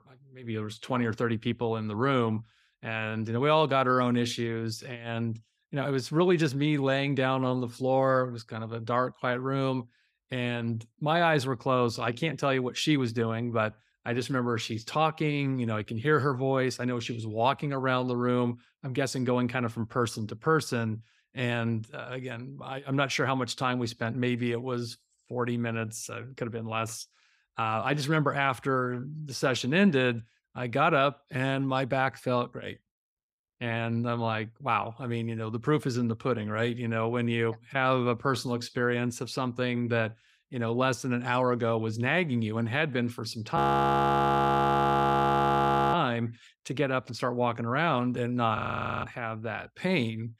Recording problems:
audio freezing; at 44 s for 2.5 s and at 49 s

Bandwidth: 15.5 kHz